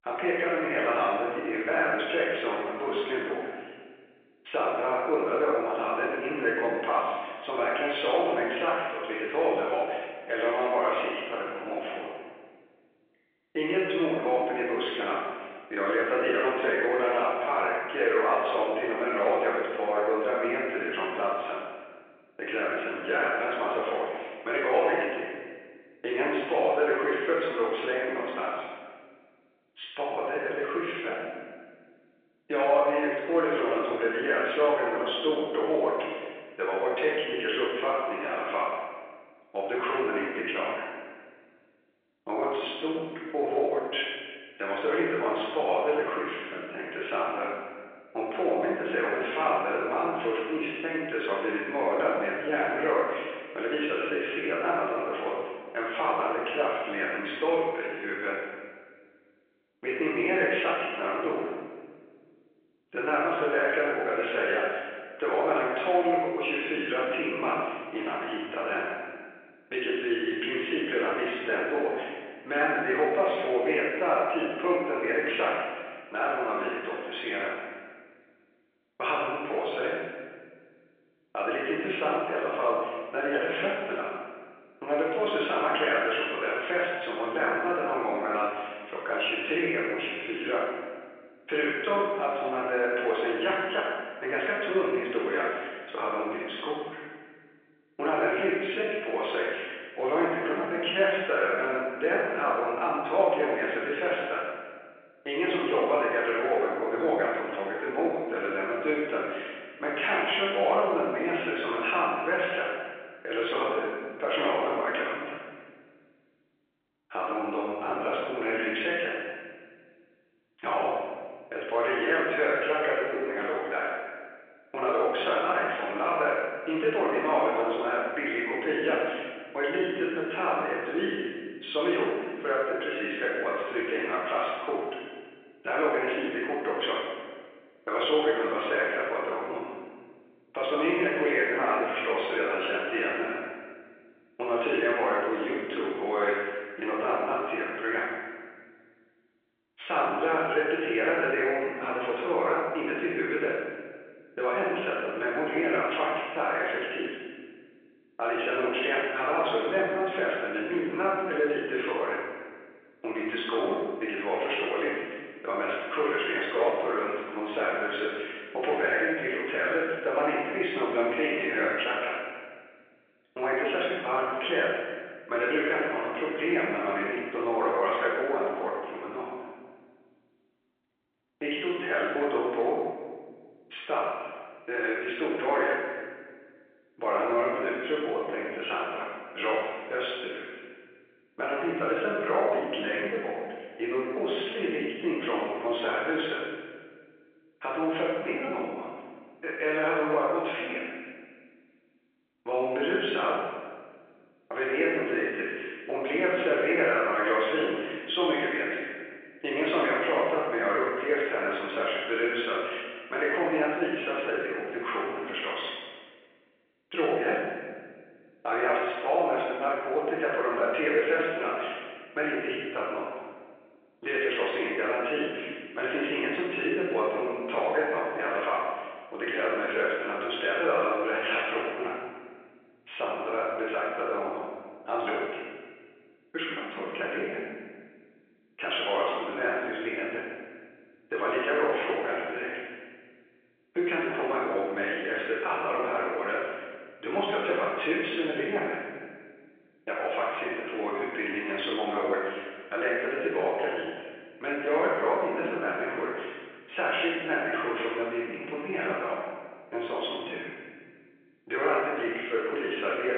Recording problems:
off-mic speech; far
room echo; noticeable; dies away in 1.6 s
phone-call audio; nothing above 3.5 kHz

